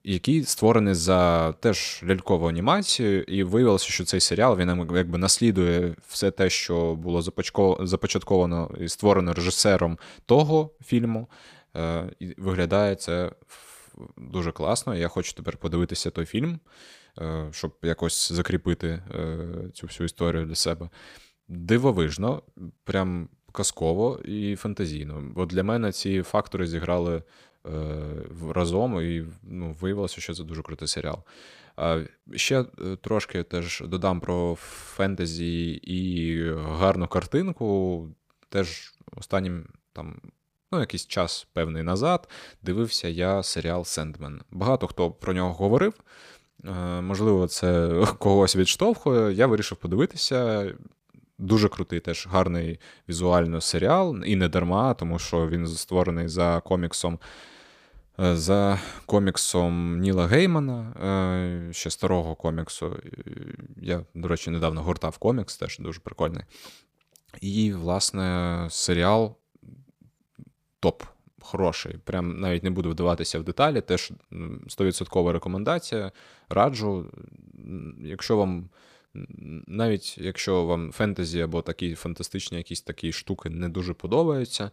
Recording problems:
none

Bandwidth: 15 kHz